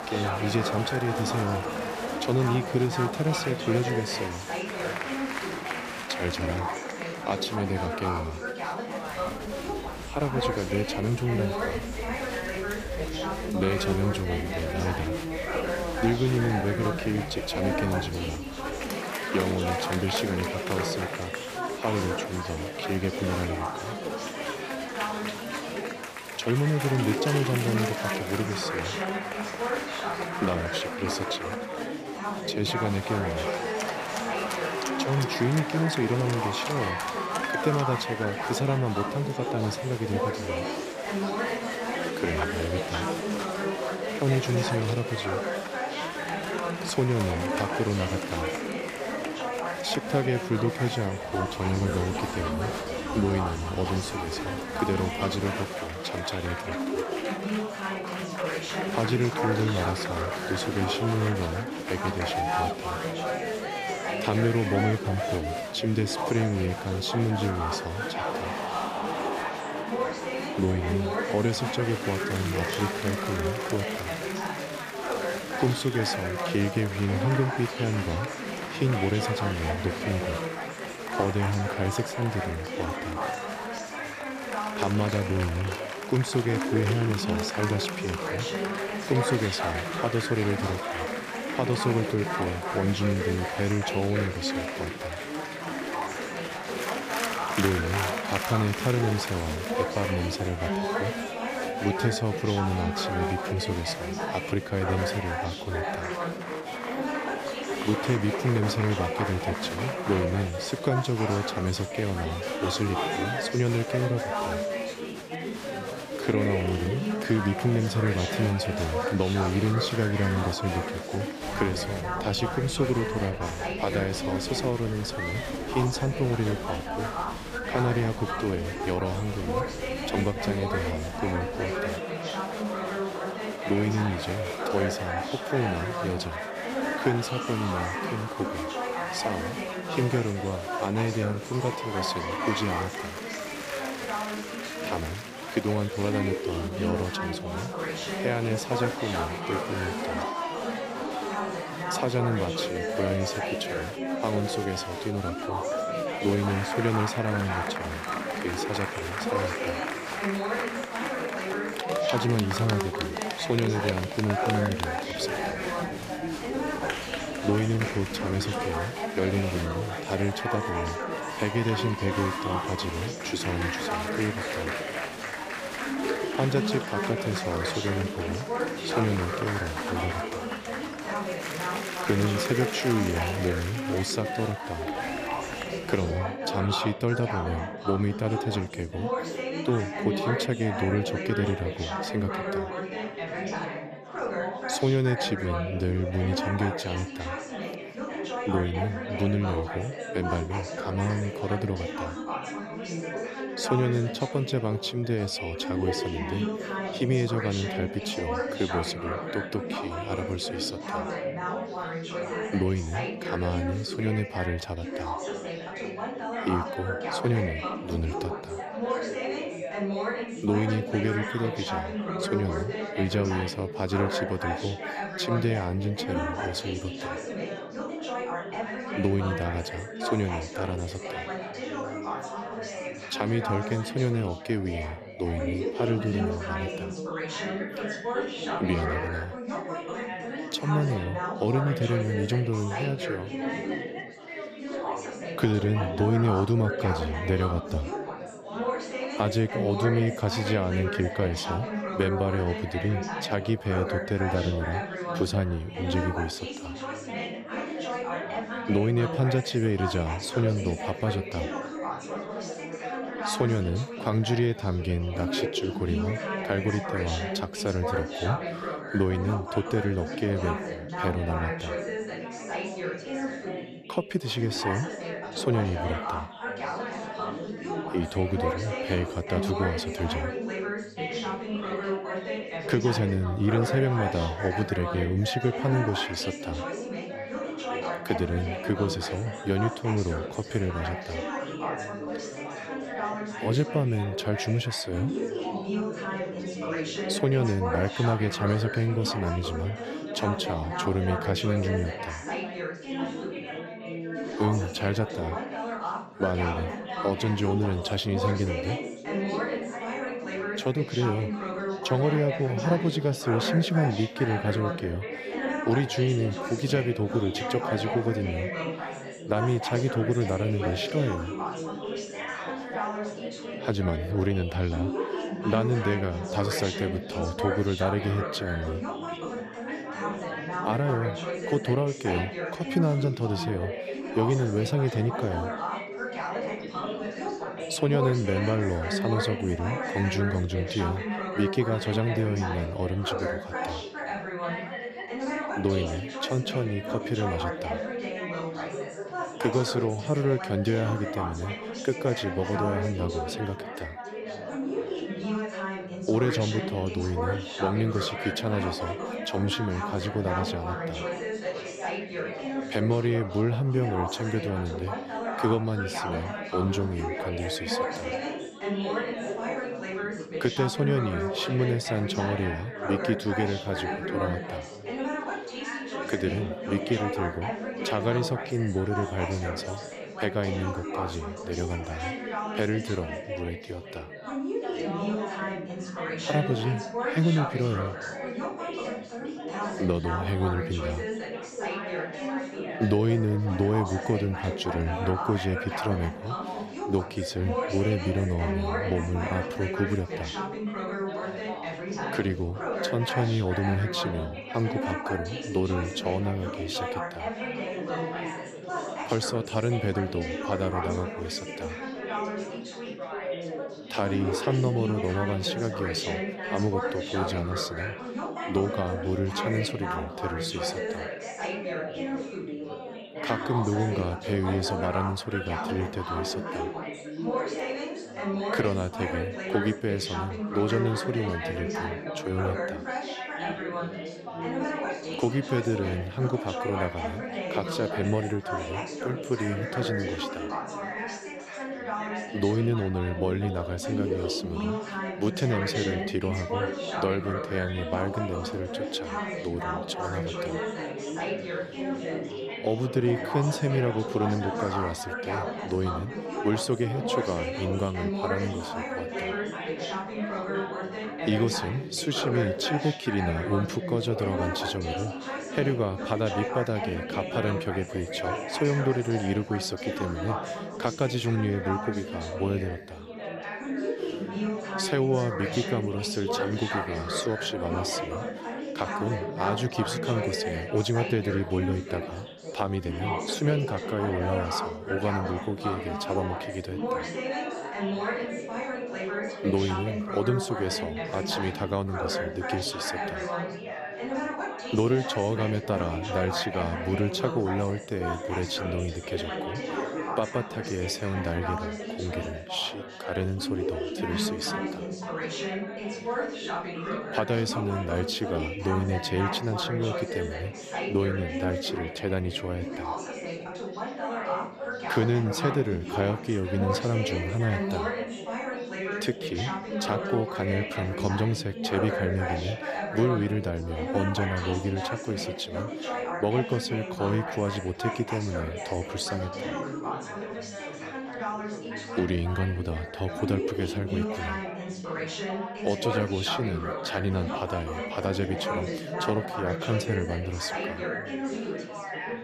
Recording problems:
chatter from many people; loud; throughout; 3 dB below the speech

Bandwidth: 15 kHz